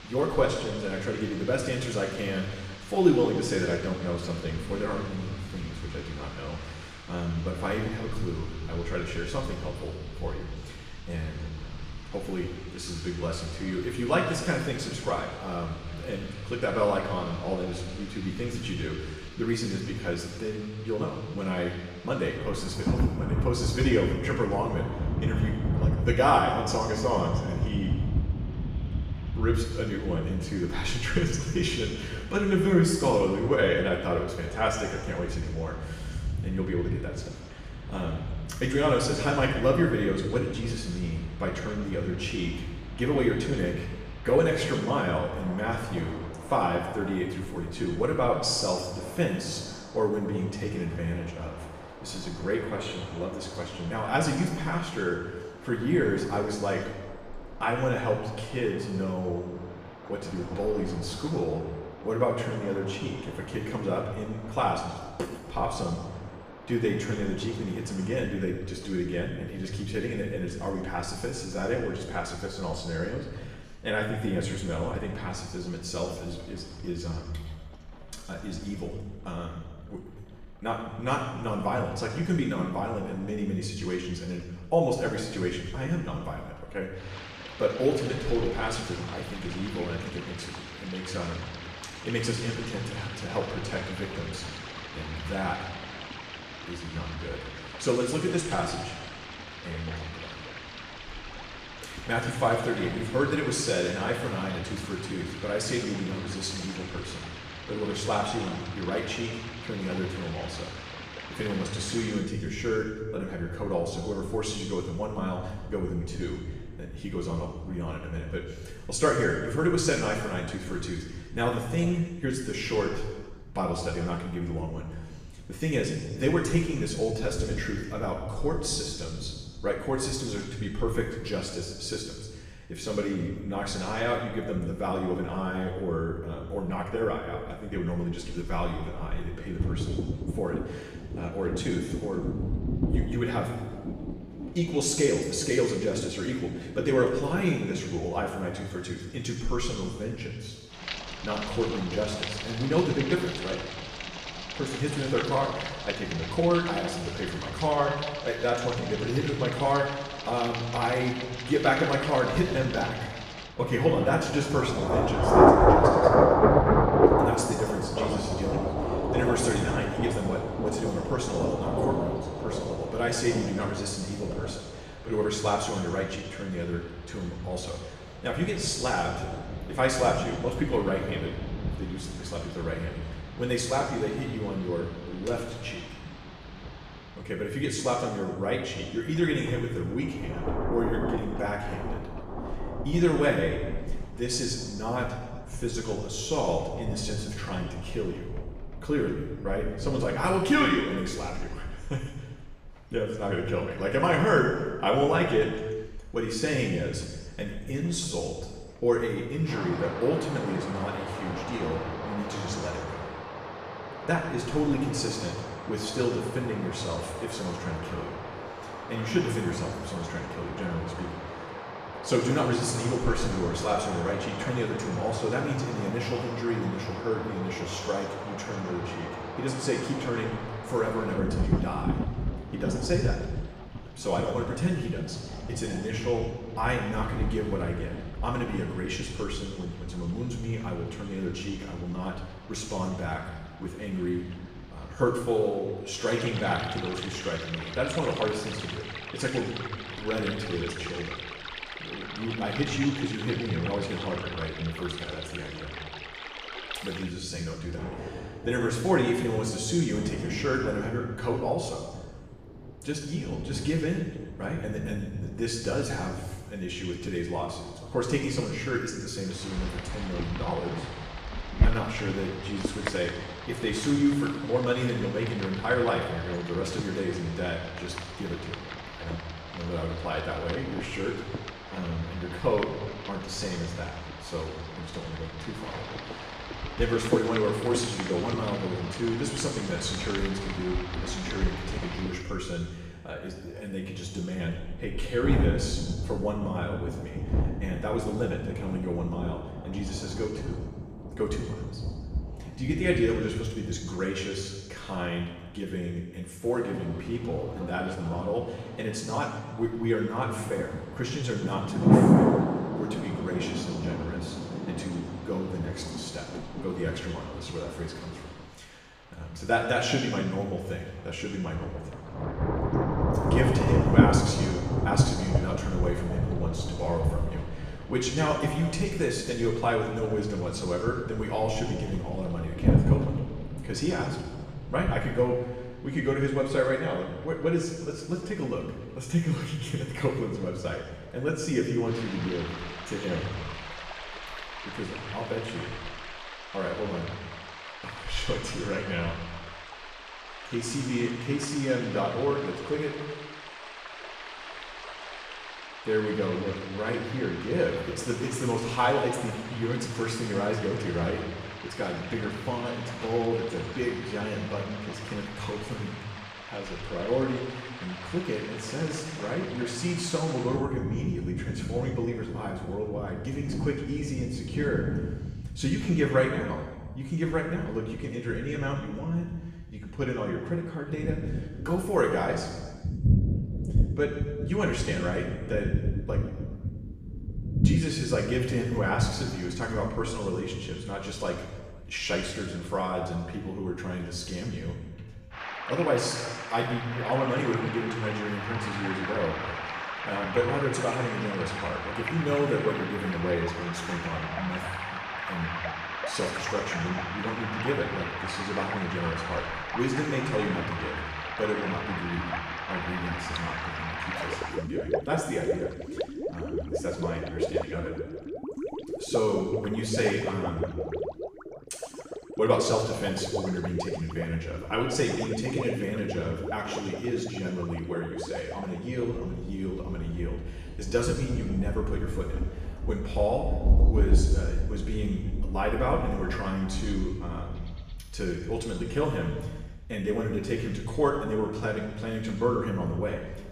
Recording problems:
off-mic speech; far
room echo; noticeable; dies away in 1.2 s
rain or running water; loud; throughout; 4 dB below the speech

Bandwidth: 14.5 kHz